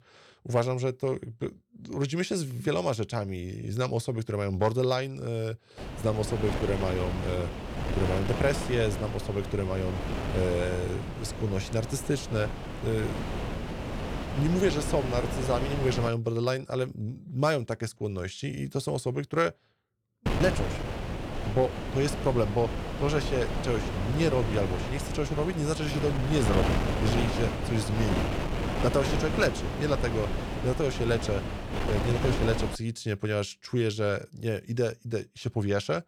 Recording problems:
wind noise on the microphone; heavy; from 6 to 16 s and from 20 to 33 s; 4 dB below the speech

